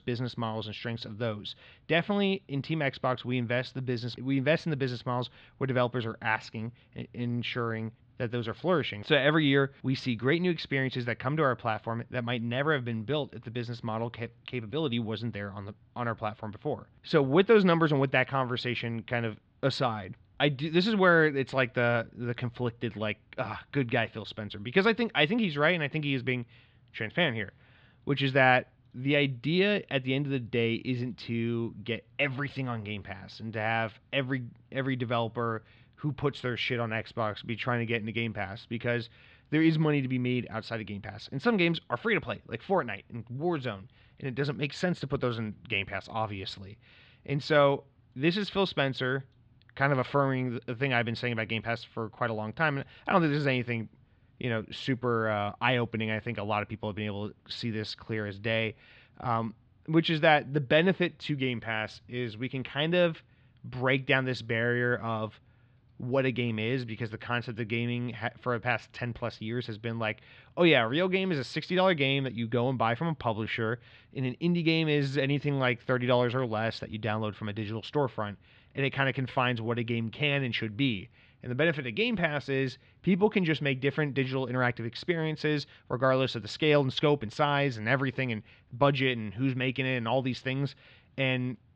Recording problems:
muffled; slightly; fading above 3.5 kHz

